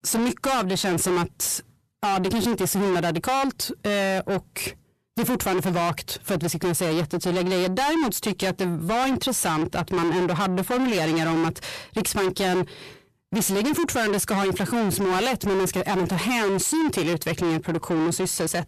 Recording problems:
distortion; heavy; 6 dB below the speech

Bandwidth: 14 kHz